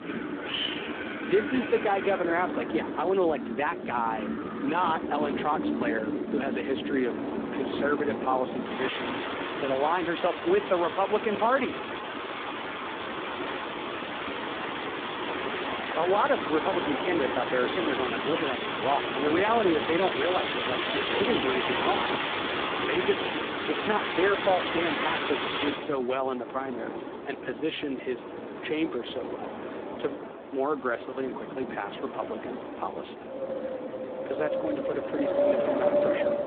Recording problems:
phone-call audio; poor line
wind in the background; loud; throughout; 2 dB below the speech

